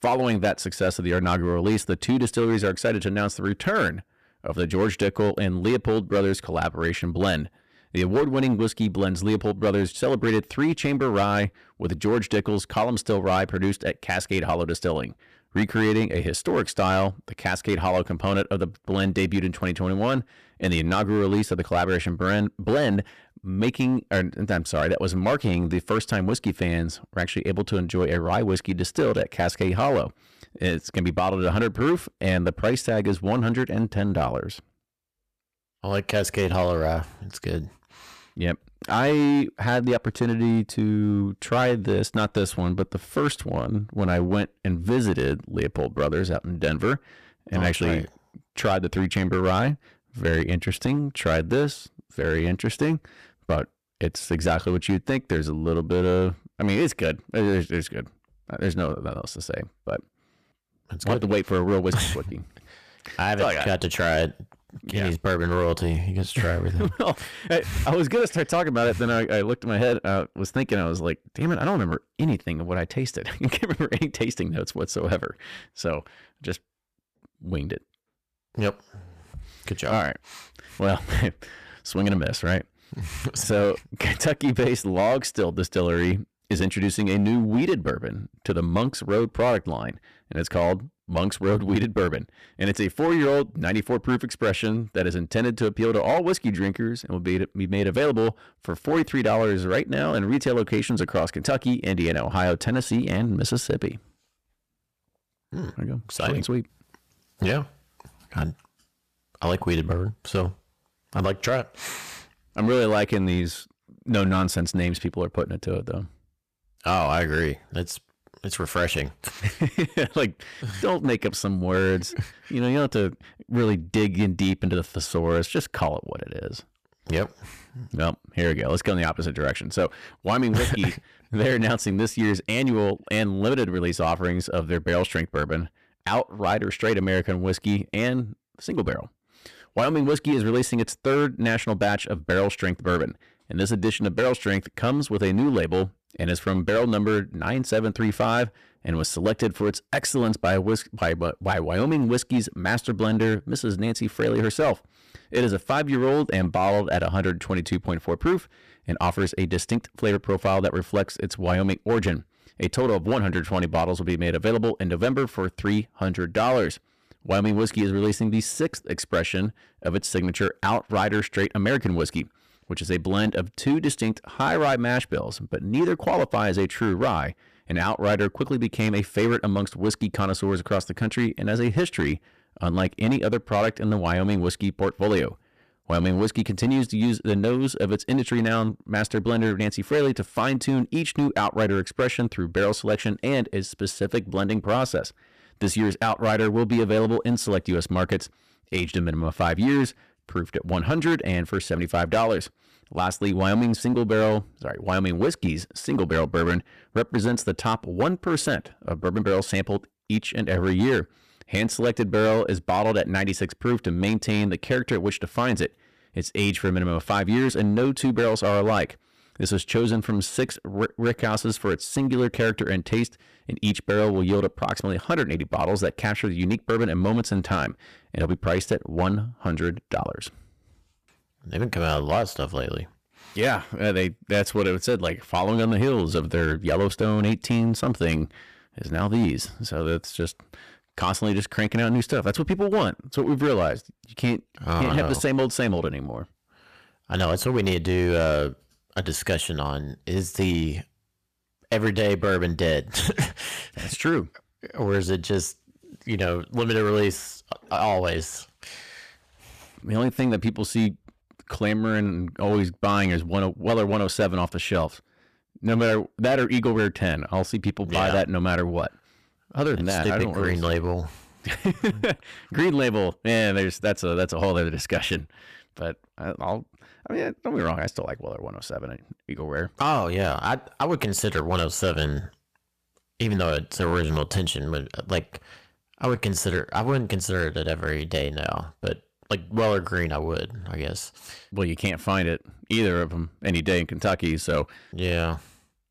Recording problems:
distortion; slight; 6% of the sound clipped

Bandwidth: 14.5 kHz